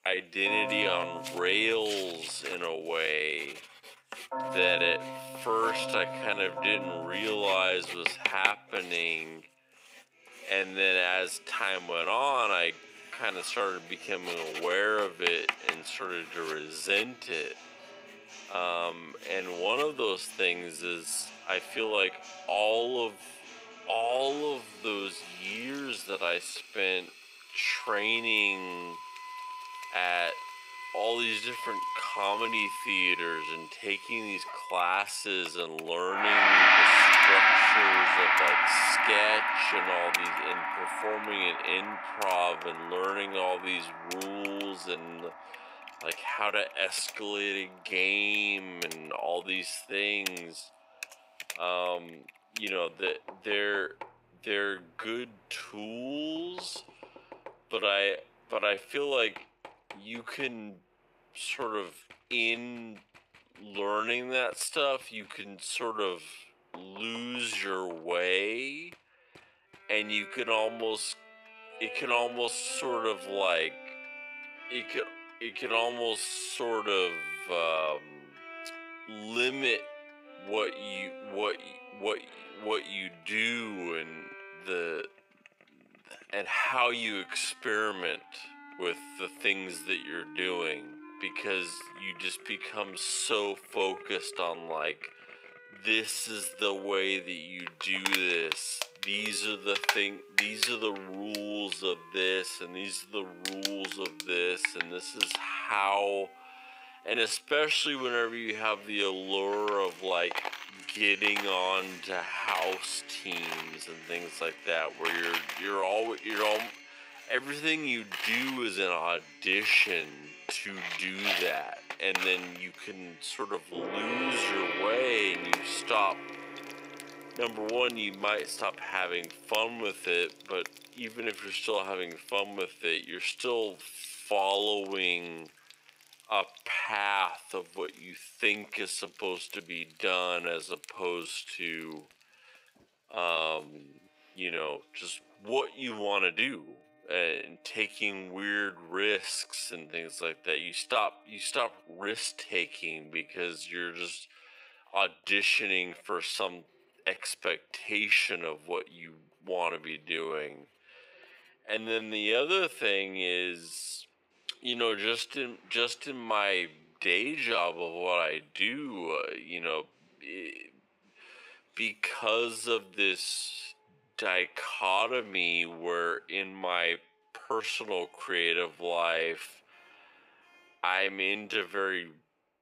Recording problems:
wrong speed, natural pitch; too slow; 0.5 times normal speed
thin; somewhat; fading below 500 Hz
background music; very loud; throughout; 2 dB above the speech
household noises; loud; throughout; 9 dB below the speech
uneven, jittery; strongly; from 6 s to 2:59

